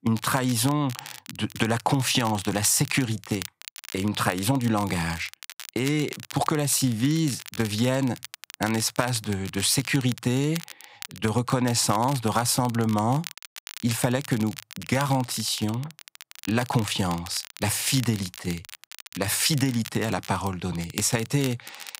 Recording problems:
crackle, like an old record; noticeable; 15 dB below the speech

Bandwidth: 15.5 kHz